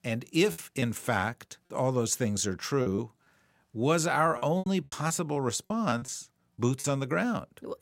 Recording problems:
choppy; very; at 0.5 s, at 3 s and from 4.5 to 7 s; 11% of the speech affected

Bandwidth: 16 kHz